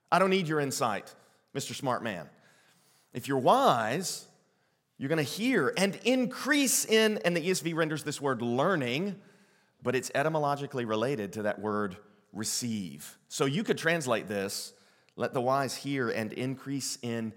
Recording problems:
none

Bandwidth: 16.5 kHz